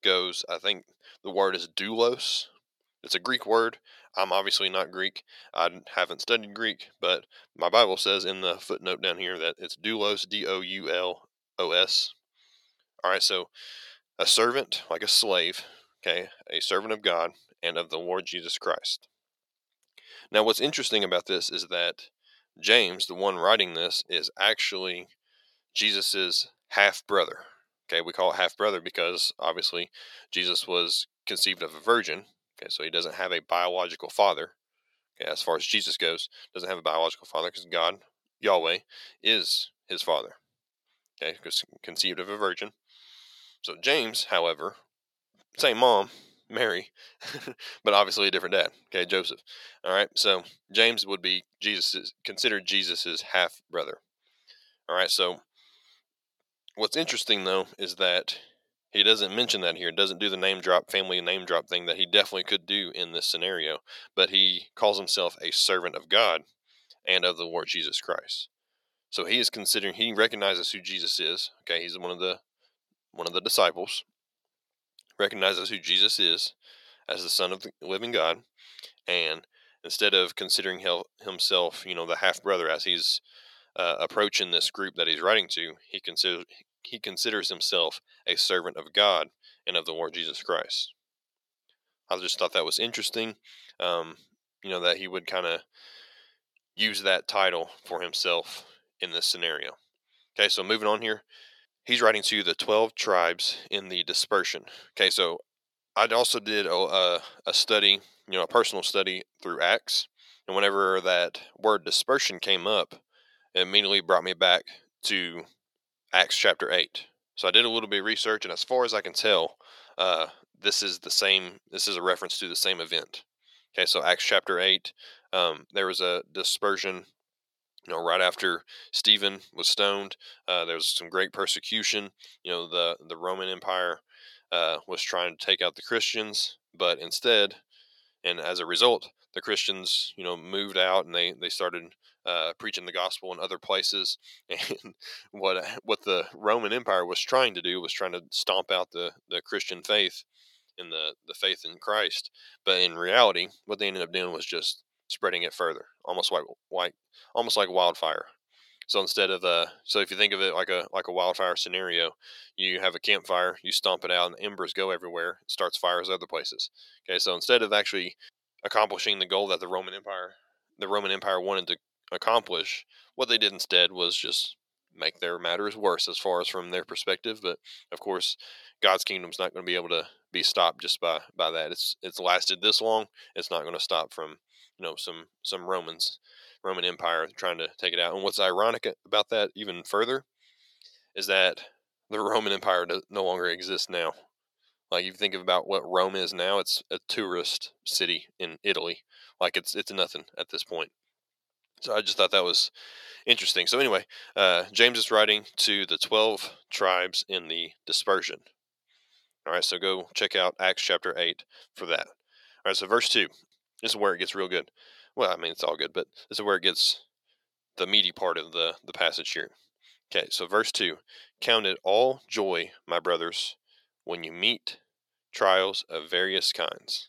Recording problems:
thin; very; fading below 600 Hz

